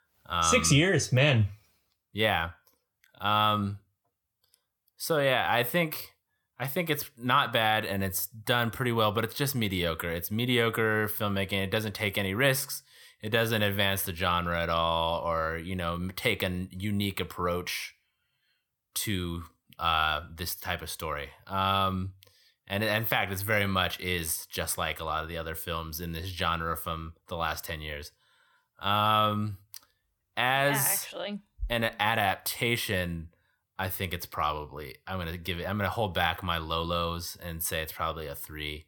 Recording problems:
none

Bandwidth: 18.5 kHz